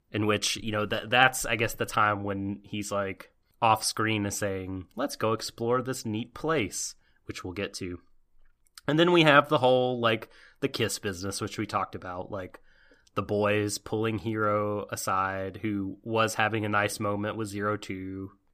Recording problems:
none

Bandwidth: 15 kHz